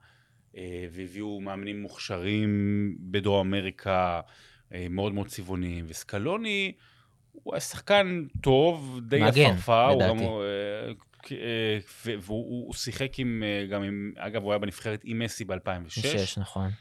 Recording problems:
none

